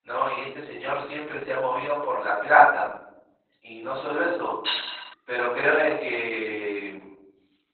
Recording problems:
off-mic speech; far
garbled, watery; badly; nothing above 4 kHz
thin; very; fading below 850 Hz
room echo; noticeable; dies away in 0.7 s
clattering dishes; noticeable; at 4.5 s; peak 4 dB below the speech

